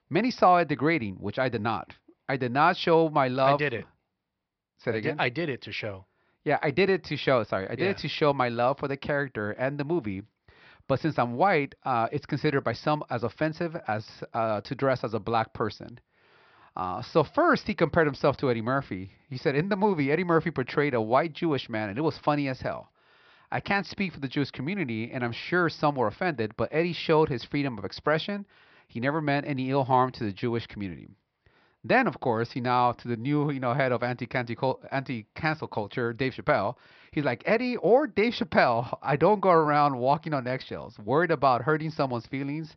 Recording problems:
high frequencies cut off; noticeable; nothing above 5.5 kHz

